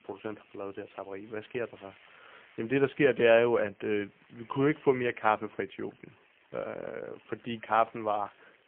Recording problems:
phone-call audio; poor line; nothing above 3 kHz
household noises; faint; throughout; 30 dB below the speech

